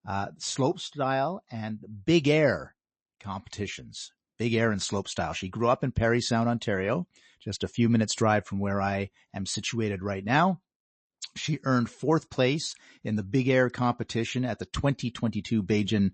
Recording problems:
garbled, watery; slightly; nothing above 8 kHz

